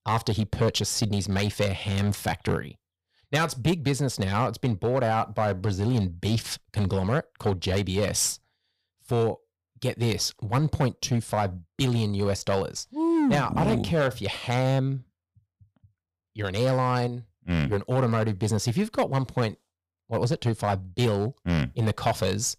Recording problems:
distortion; slight; 5% of the sound clipped

